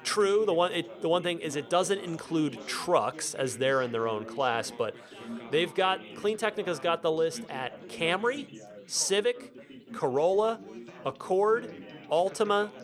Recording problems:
background chatter; noticeable; throughout; 4 voices, 15 dB below the speech

